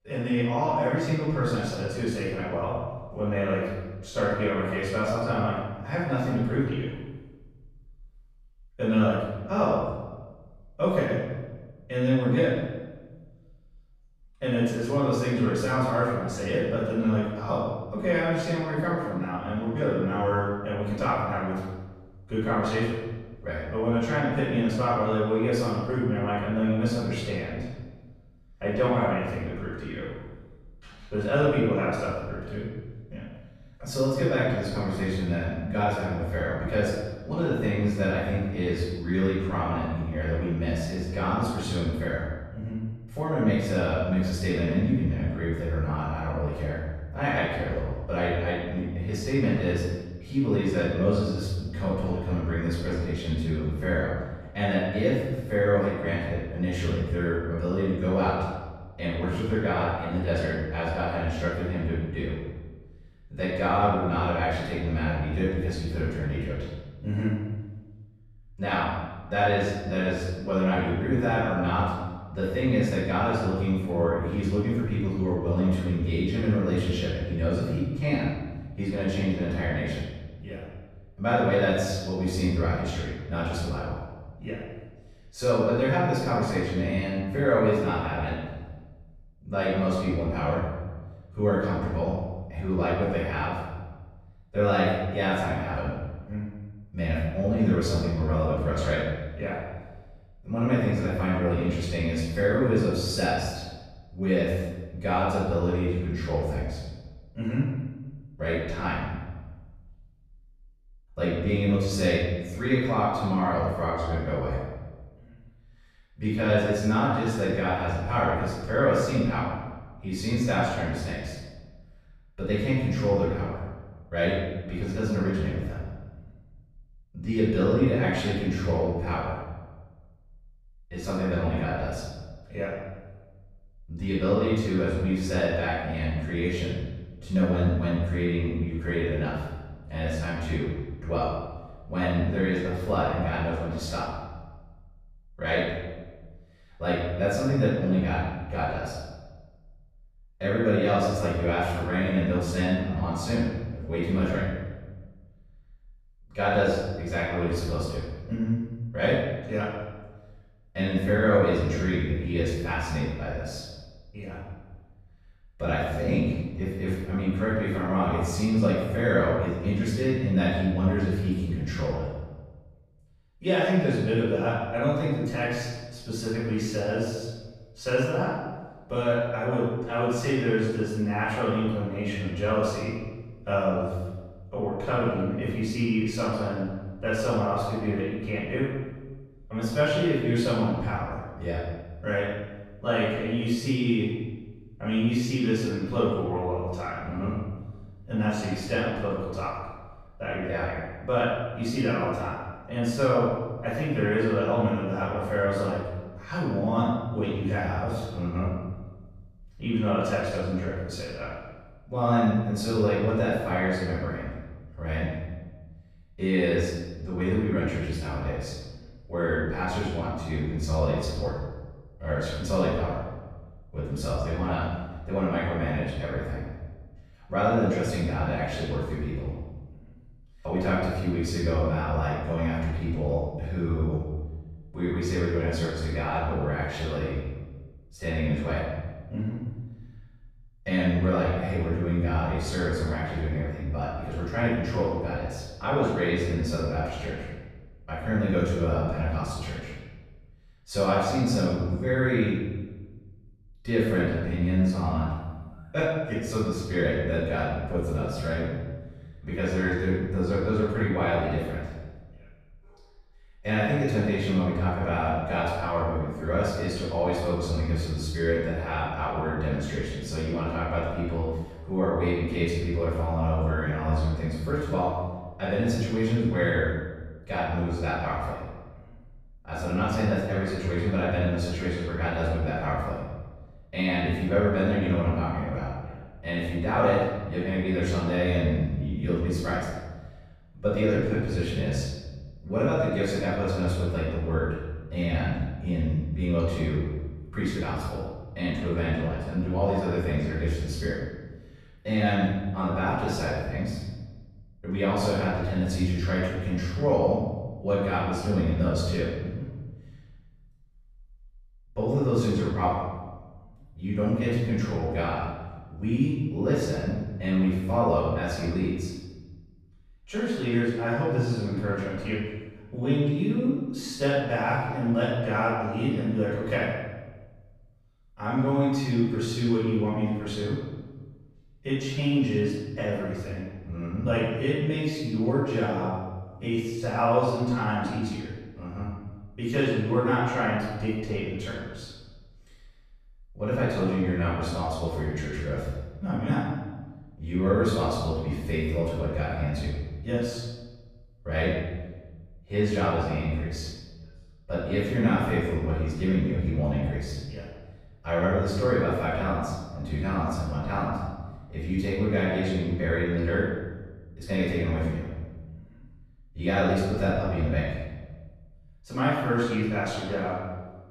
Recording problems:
room echo; strong; dies away in 1.1 s
off-mic speech; far

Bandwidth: 14.5 kHz